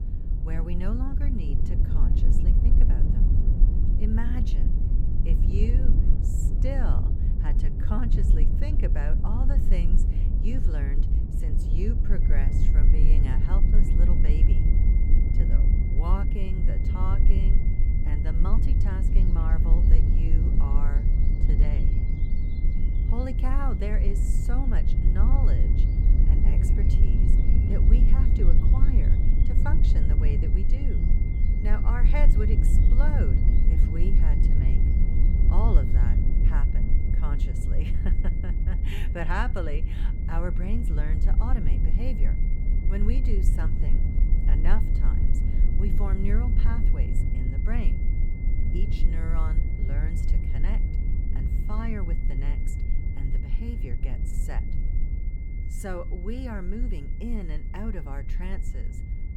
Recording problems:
low rumble; loud; throughout; 2 dB below the speech
high-pitched whine; noticeable; from 12 s on; 2 kHz, 15 dB below the speech
animal sounds; faint; throughout; 30 dB below the speech

